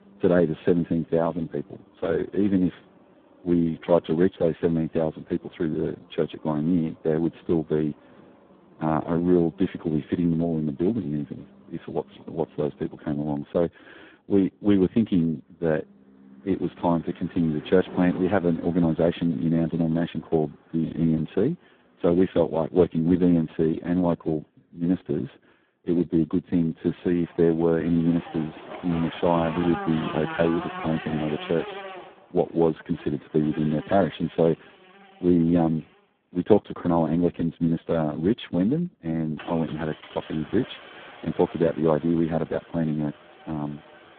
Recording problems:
phone-call audio; poor line; nothing above 8 kHz
traffic noise; noticeable; throughout; 15 dB below the speech

